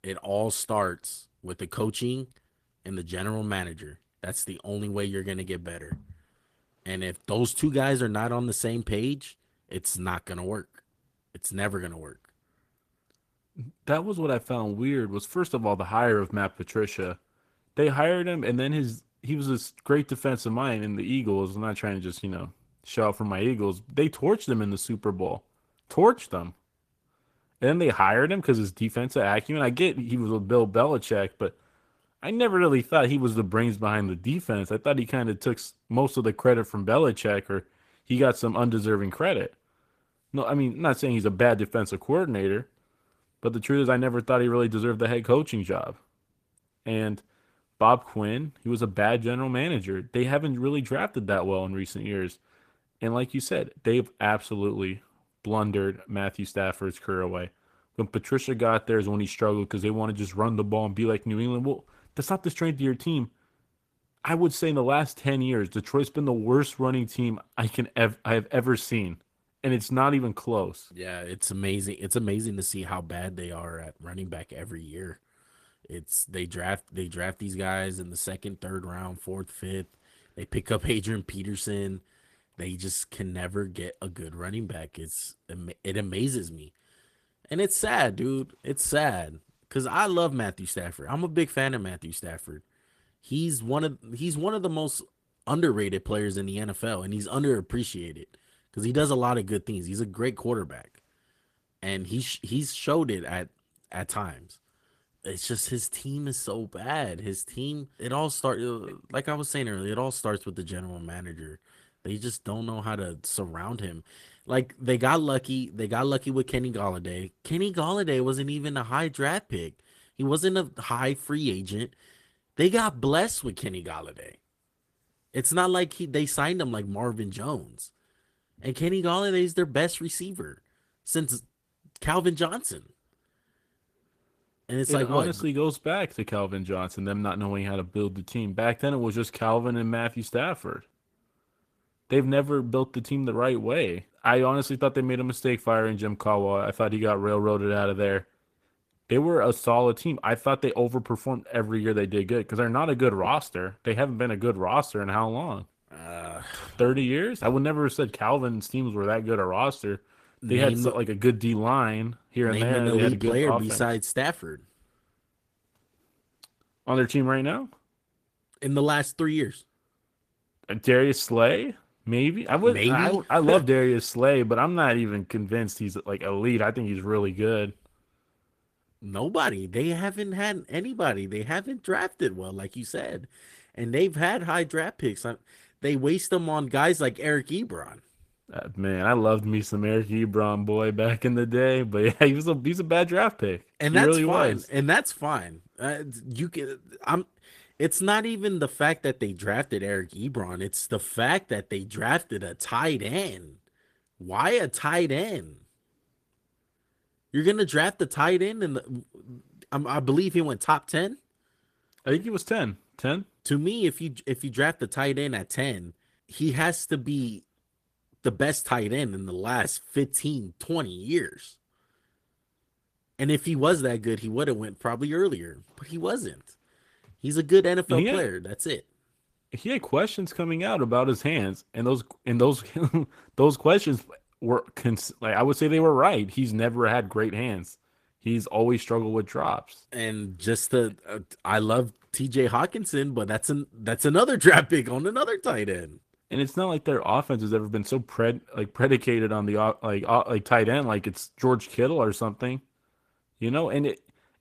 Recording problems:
garbled, watery; slightly

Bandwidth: 14.5 kHz